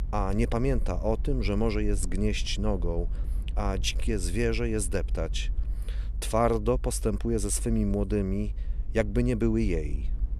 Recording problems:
low rumble; faint; throughout; 25 dB below the speech

